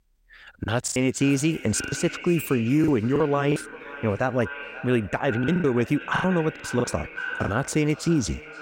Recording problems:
echo of what is said; noticeable; throughout; 530 ms later, 10 dB below the speech
choppy; very; 11% of the speech affected

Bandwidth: 16 kHz